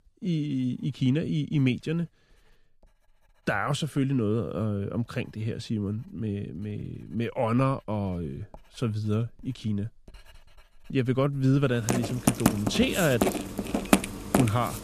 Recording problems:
household noises; very loud; throughout; 1 dB above the speech

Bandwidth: 14 kHz